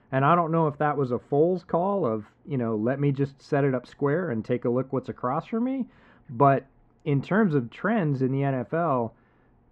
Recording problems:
muffled; very; fading above 1.5 kHz

